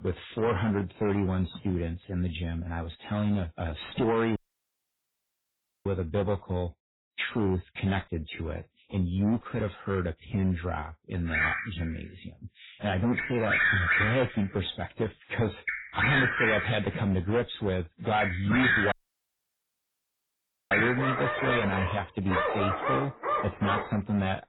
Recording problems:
distortion; heavy; 9% of the sound clipped
garbled, watery; badly; nothing above 4 kHz
animal sounds; very loud; from 11 s on; 2 dB above the speech
audio cutting out; at 4.5 s for 1.5 s and at 19 s for 2 s

